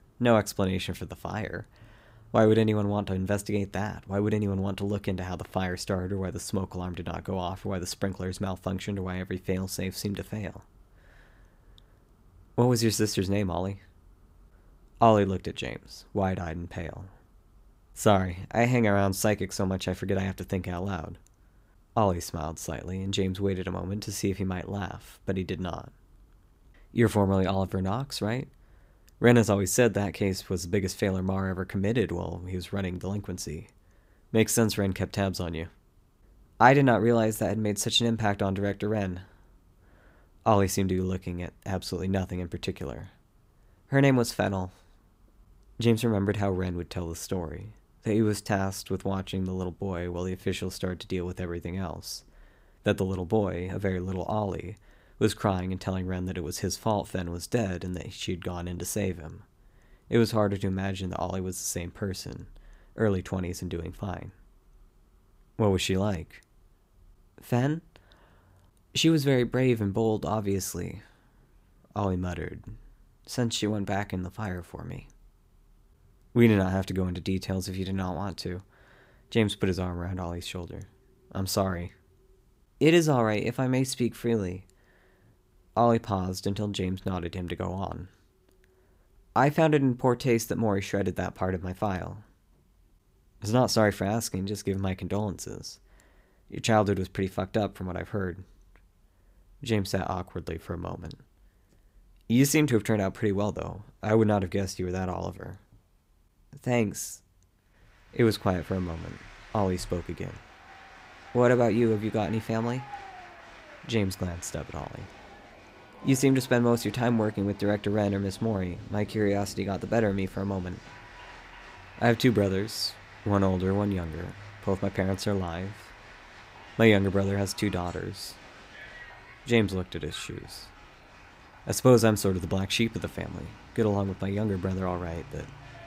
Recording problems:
crowd noise; faint; from 1:48 on; 20 dB below the speech

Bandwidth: 15.5 kHz